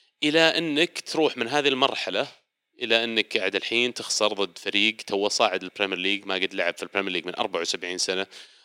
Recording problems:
thin; somewhat; fading below 300 Hz

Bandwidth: 16 kHz